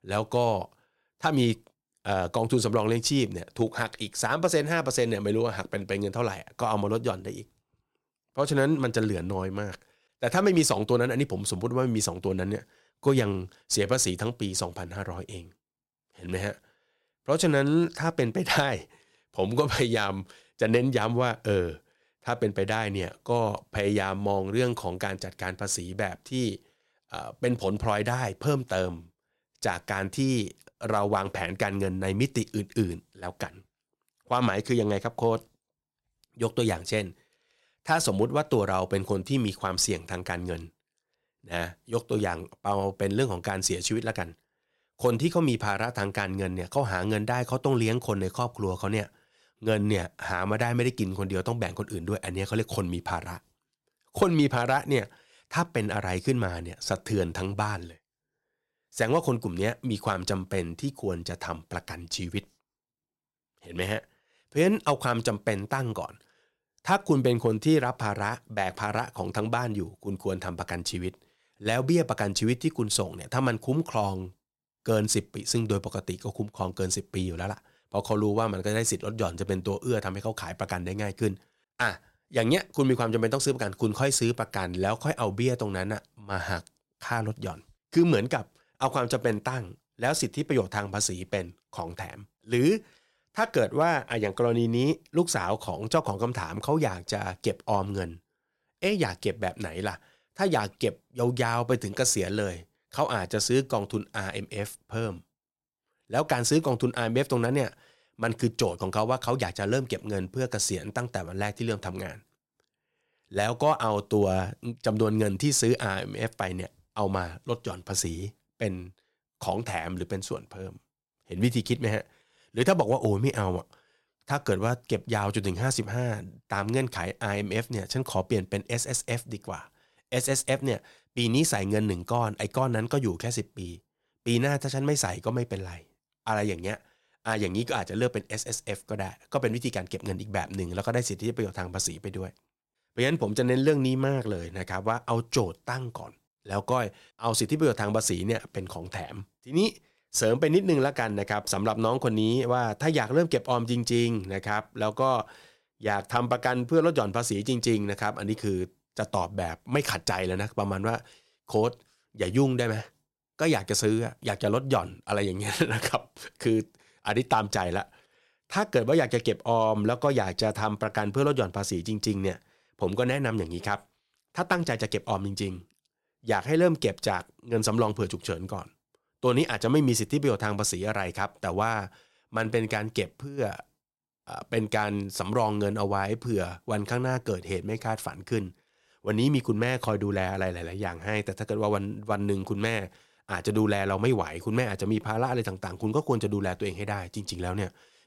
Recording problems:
none

